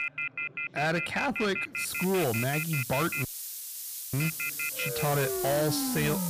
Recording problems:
distortion; slight; 12% of the sound clipped
alarms or sirens; loud; throughout; 3 dB below the speech
hiss; loud; from 2 s on; 5 dB below the speech
background chatter; faint; throughout; 3 voices, 25 dB below the speech
audio cutting out; at 3.5 s for 1 s

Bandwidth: 15 kHz